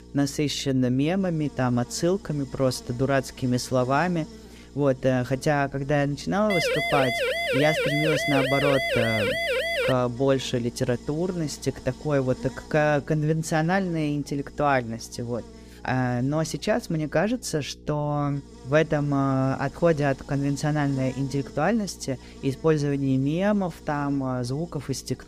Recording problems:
electrical hum; faint; throughout; 60 Hz, 20 dB below the speech
siren; loud; from 6.5 to 10 s; peak 1 dB above the speech

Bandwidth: 15 kHz